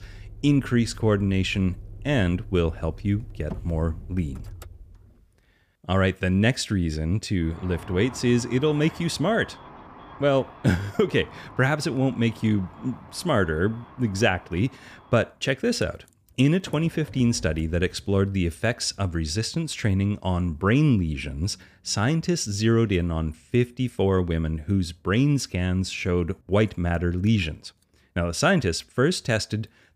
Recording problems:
traffic noise; noticeable; throughout; 20 dB below the speech

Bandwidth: 15 kHz